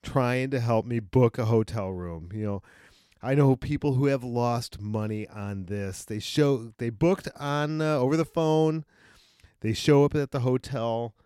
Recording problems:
none

